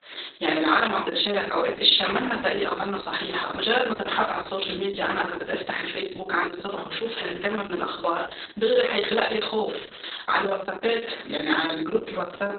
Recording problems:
off-mic speech; far
garbled, watery; badly; nothing above 4 kHz
thin; somewhat; fading below 400 Hz
room echo; slight; dies away in 0.5 s

